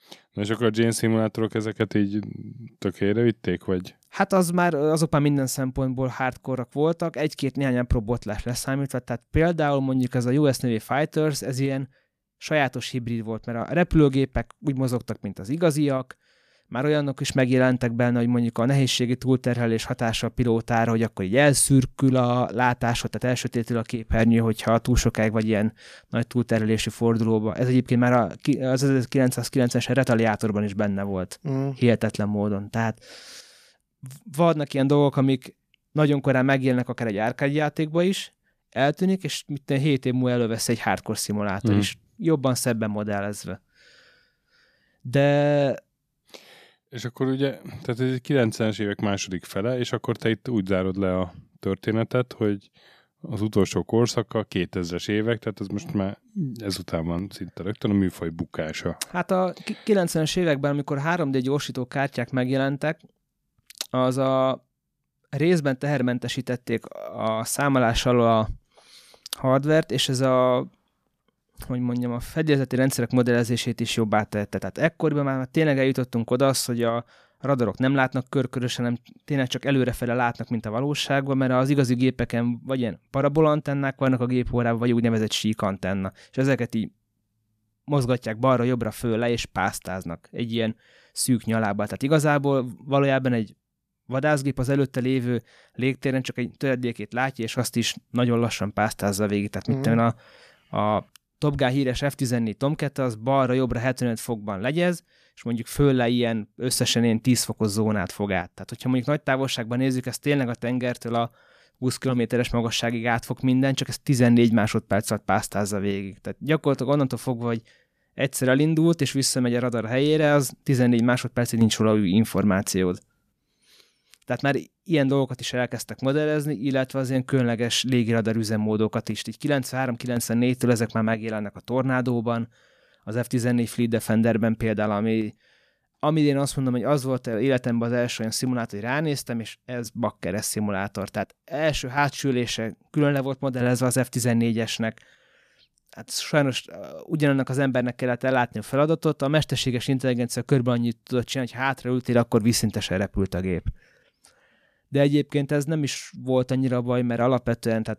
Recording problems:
none

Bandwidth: 14.5 kHz